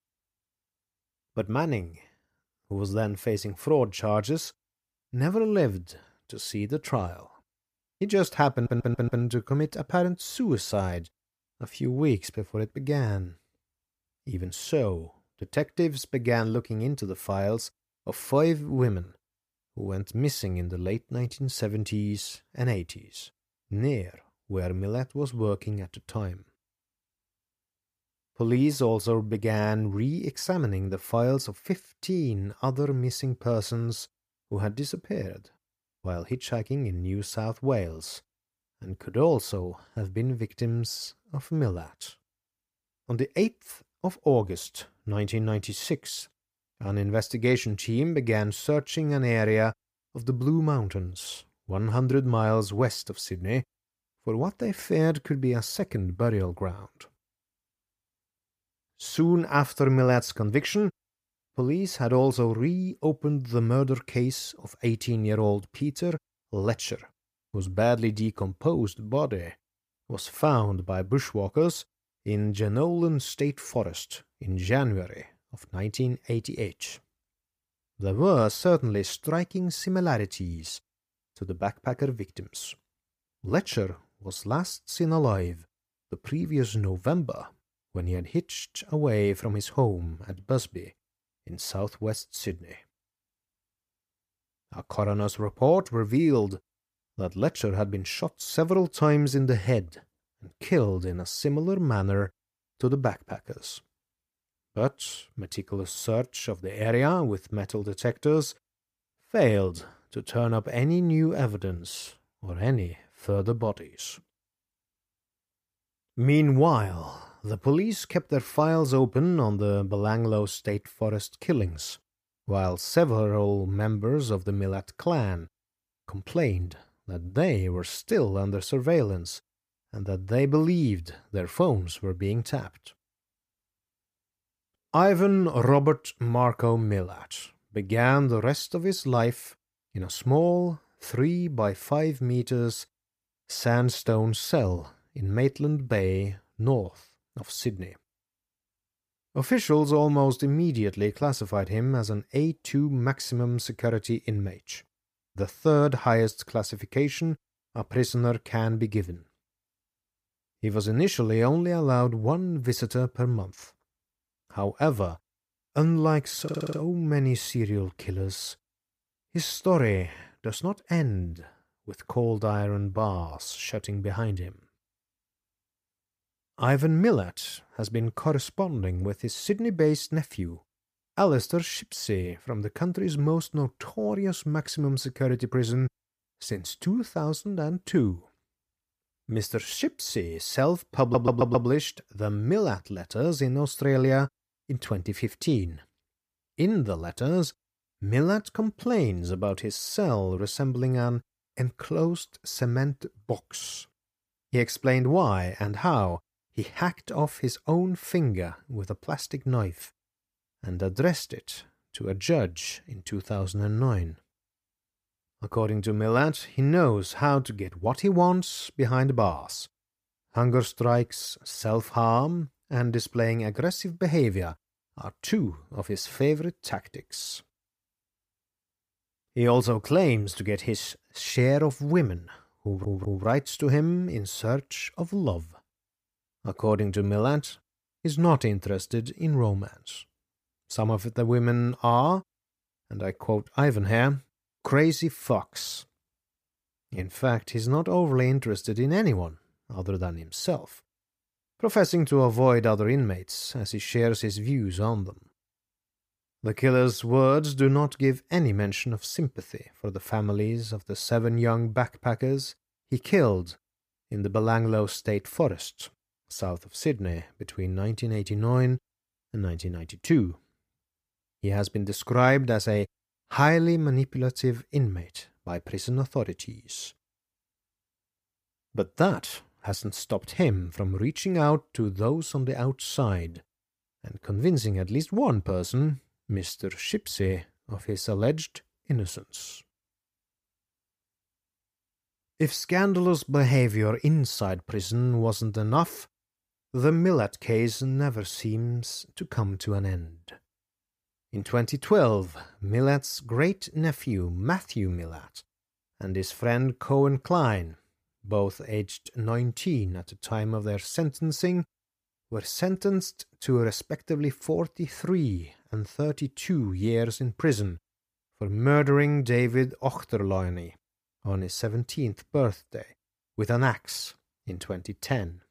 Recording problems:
audio stuttering; 4 times, first at 8.5 s

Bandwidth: 15 kHz